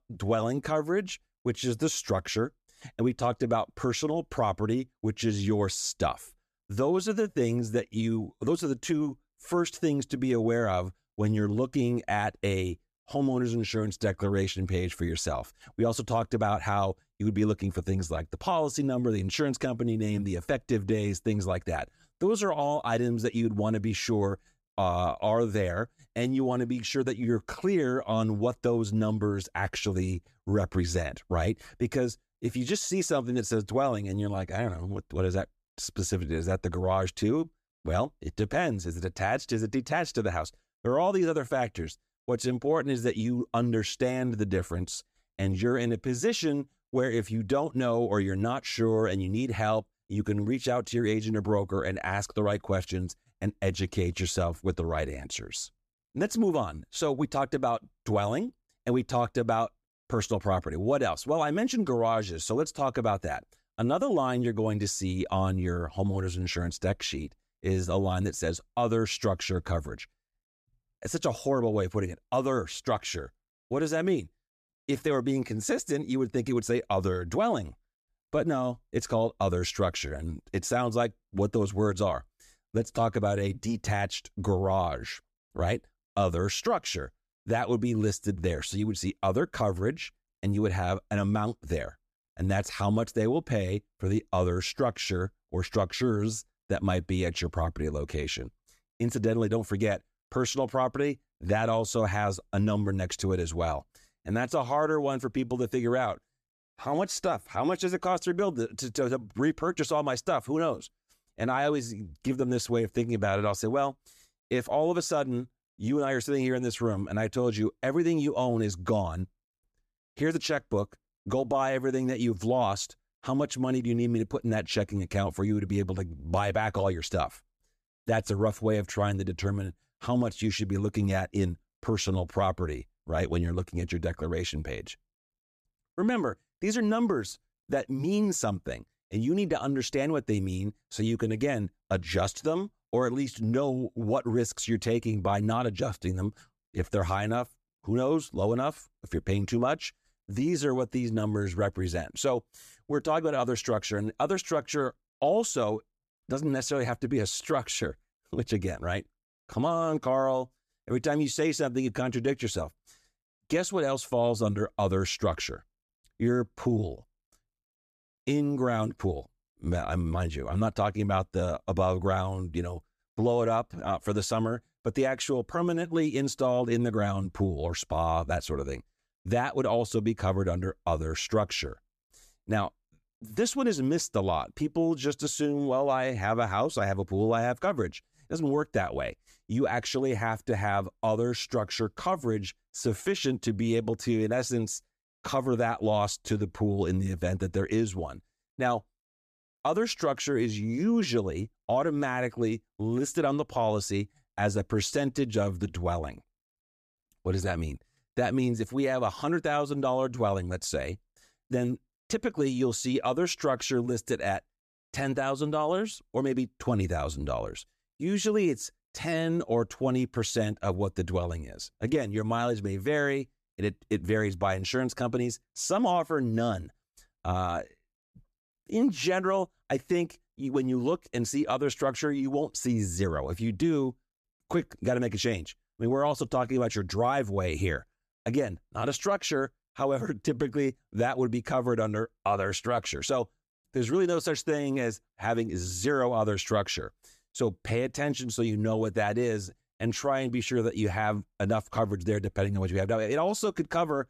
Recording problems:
none

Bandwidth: 14.5 kHz